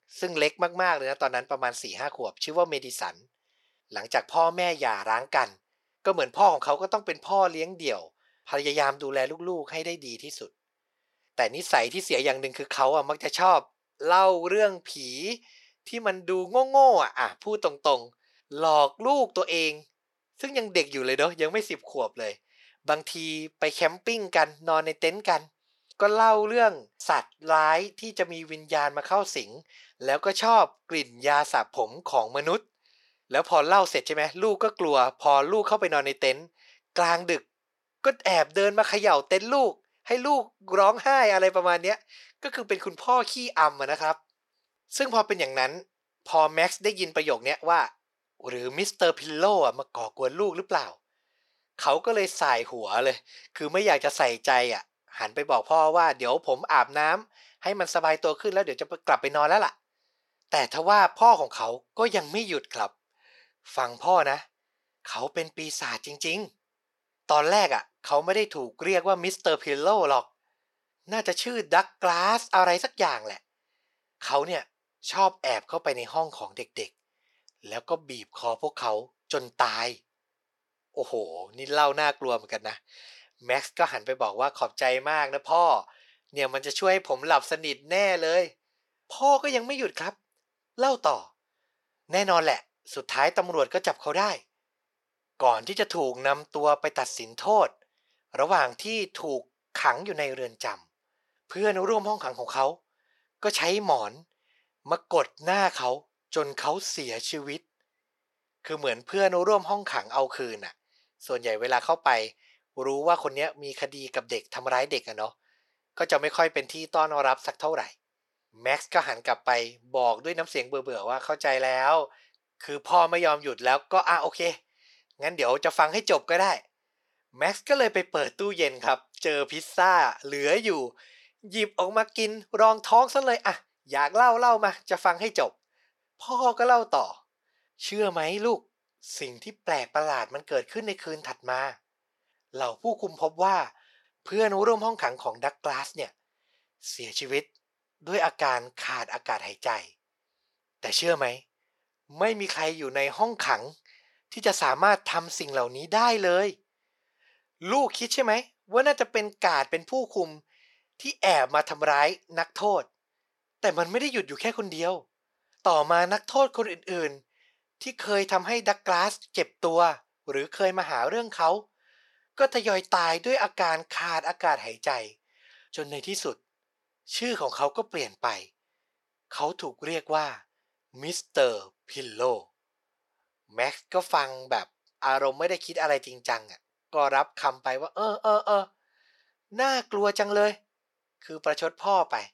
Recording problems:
thin; very; fading below 500 Hz

